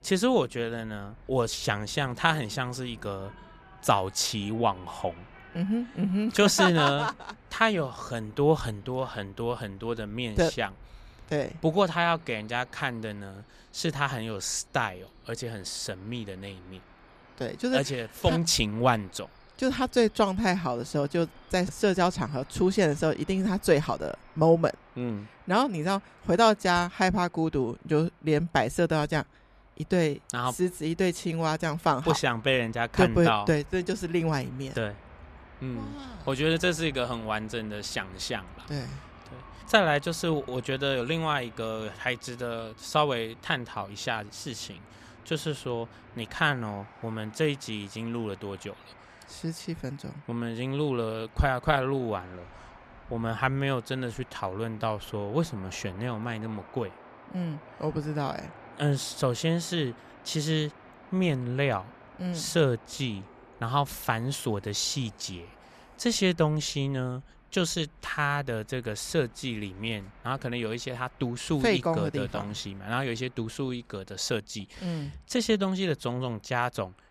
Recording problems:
train or aircraft noise; faint; throughout; 25 dB below the speech

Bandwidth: 14.5 kHz